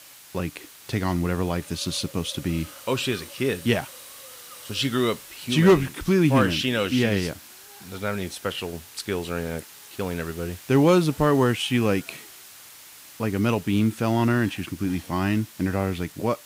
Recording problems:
hiss; noticeable; throughout; 20 dB below the speech

